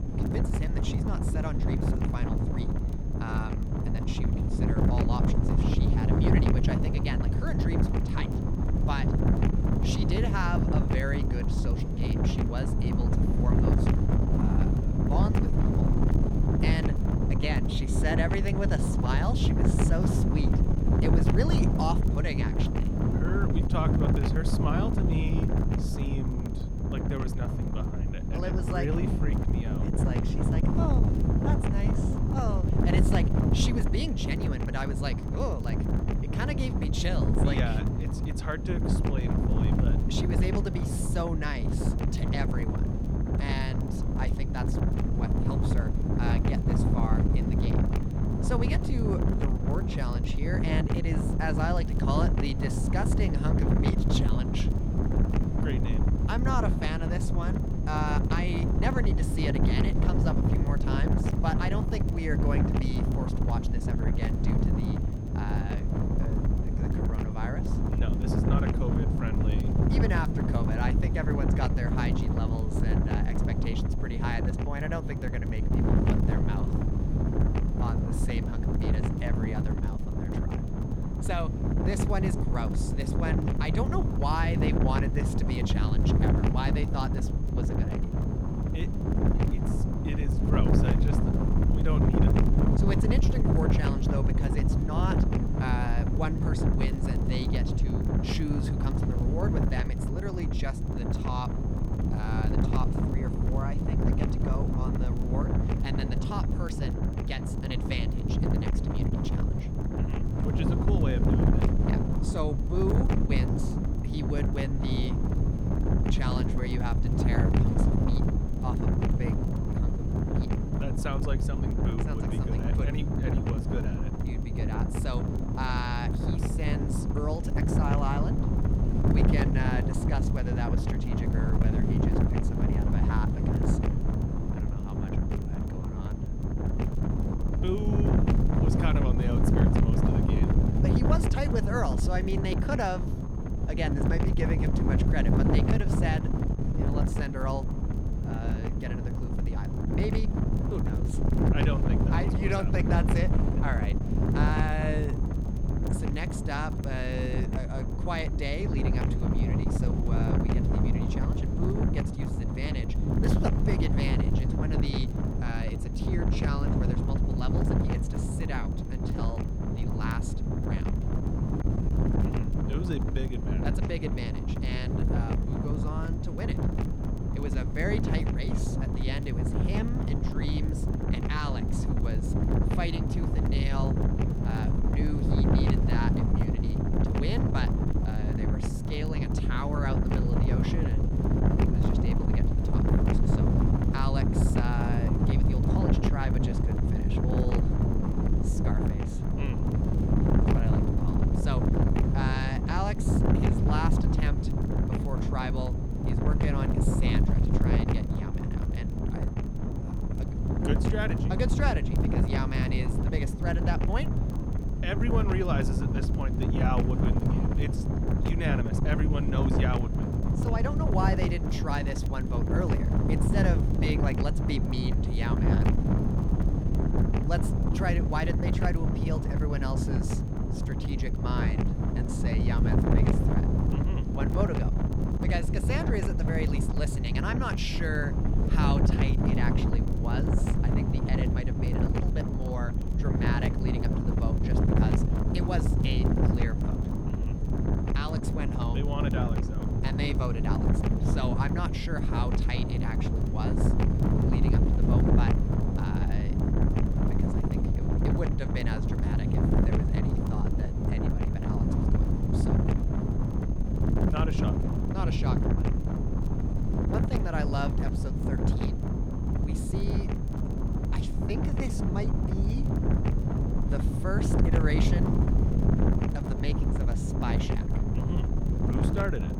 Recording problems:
wind noise on the microphone; heavy; 1 dB above the speech
high-pitched whine; faint; throughout; 6.5 kHz, 30 dB below the speech
crackle, like an old record; faint; 30 dB below the speech
electrical hum; very faint; throughout; 60 Hz, 30 dB below the speech

